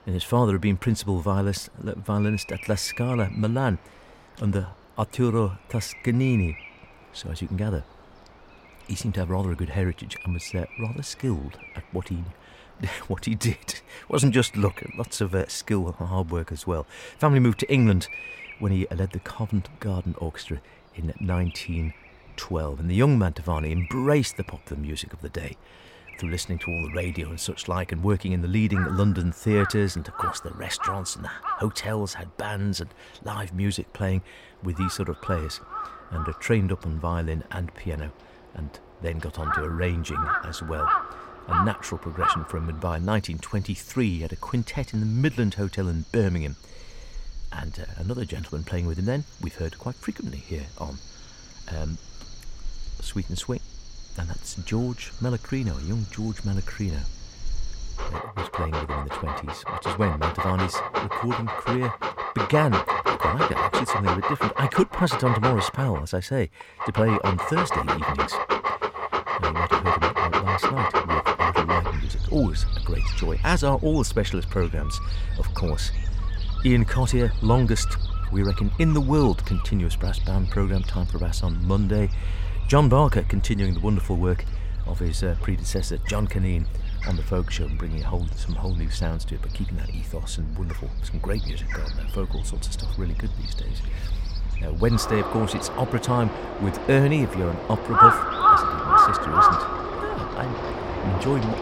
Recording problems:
animal sounds; very loud; throughout; as loud as the speech

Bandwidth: 16 kHz